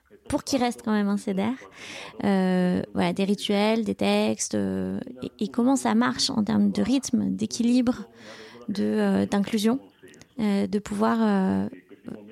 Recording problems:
voice in the background; faint; throughout; 25 dB below the speech

